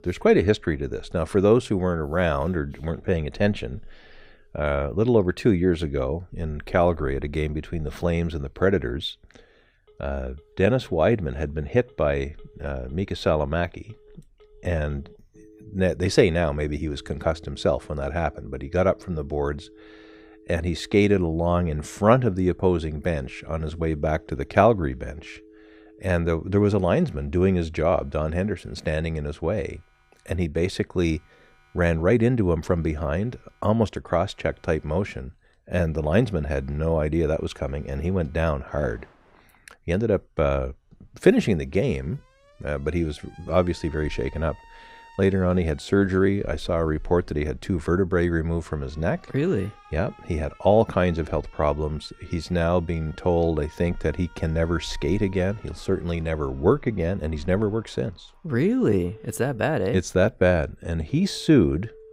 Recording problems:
alarms or sirens; faint; throughout; 30 dB below the speech

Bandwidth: 15.5 kHz